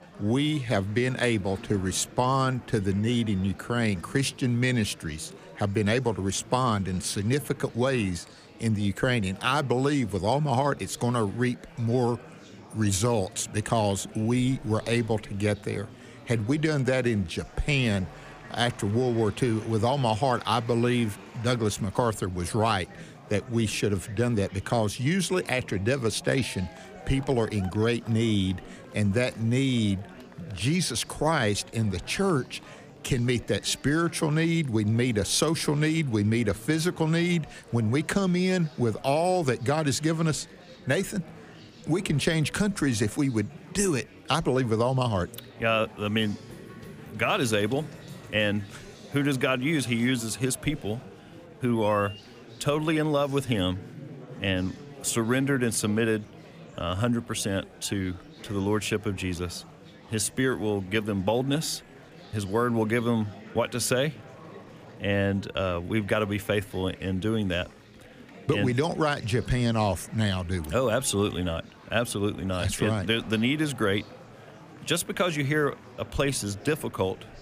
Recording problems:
murmuring crowd; noticeable; throughout; 20 dB below the speech

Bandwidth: 15 kHz